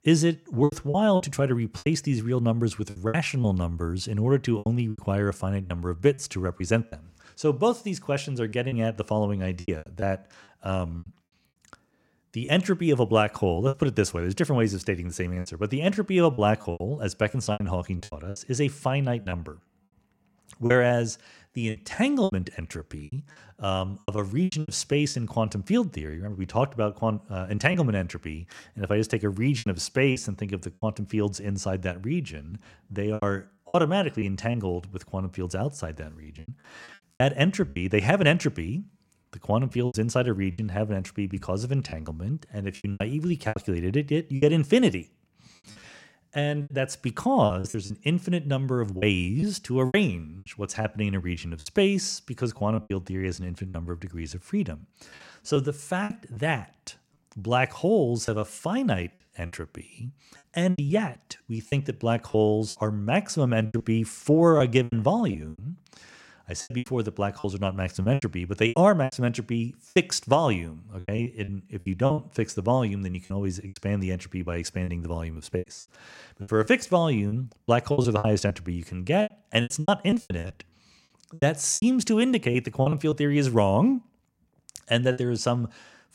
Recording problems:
choppy; very; 10% of the speech affected

